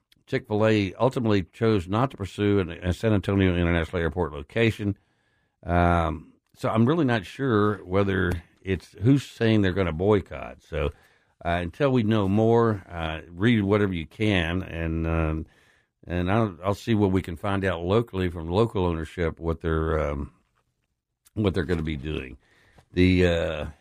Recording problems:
none

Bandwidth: 15 kHz